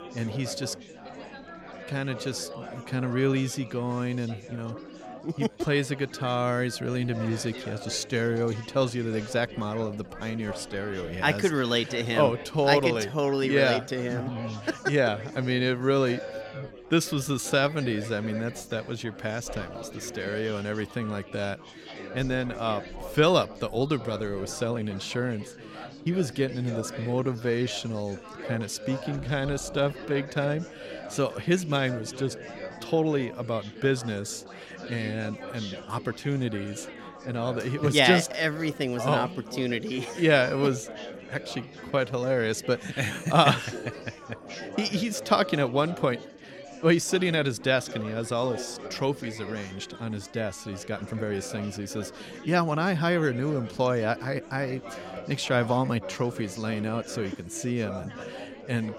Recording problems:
chatter from many people; noticeable; throughout; 15 dB below the speech
uneven, jittery; strongly; from 4.5 to 51 s

